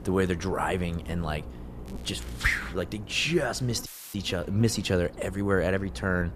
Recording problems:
electrical hum; noticeable; throughout; 60 Hz, 20 dB below the speech
crackling; faint; at 2 s; 25 dB below the speech
audio cutting out; filled with static; at 4 s

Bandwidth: 14.5 kHz